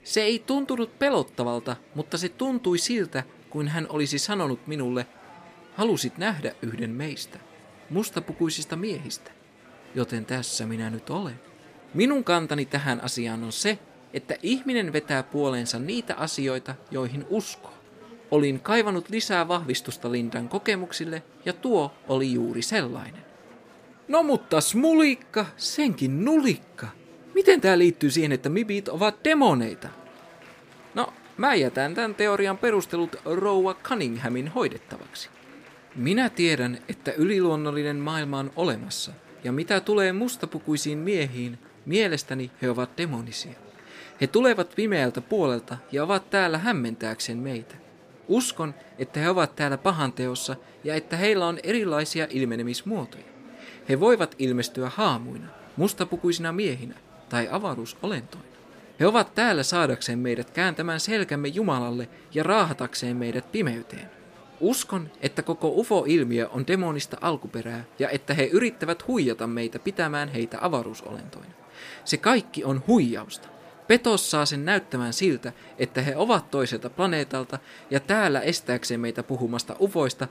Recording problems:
murmuring crowd; faint; throughout; 25 dB below the speech

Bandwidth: 15 kHz